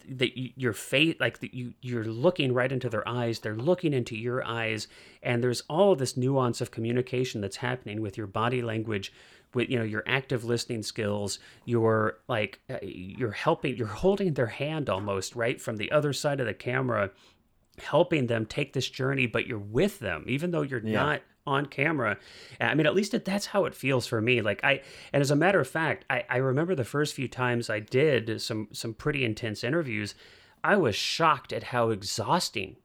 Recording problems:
none

